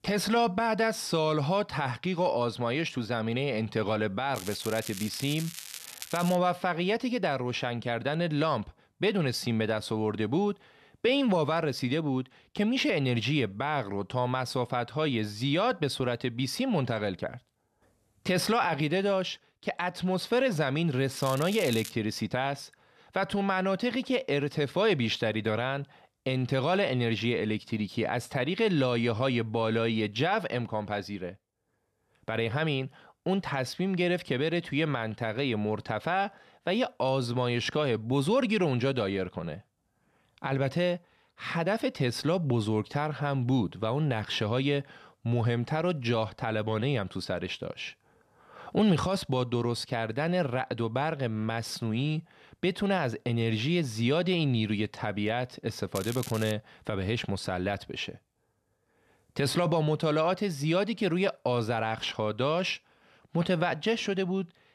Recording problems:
crackling; noticeable; from 4.5 to 6.5 s, at 21 s and at 56 s; 10 dB below the speech

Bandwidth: 13.5 kHz